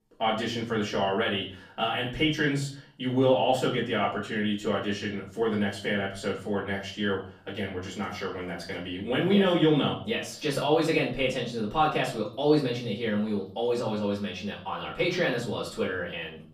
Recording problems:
off-mic speech; far
room echo; slight; dies away in 0.4 s

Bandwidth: 14.5 kHz